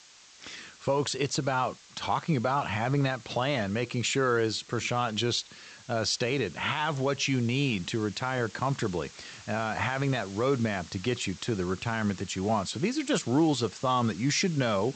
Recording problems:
high frequencies cut off; noticeable; nothing above 8 kHz
hiss; noticeable; throughout; 20 dB below the speech

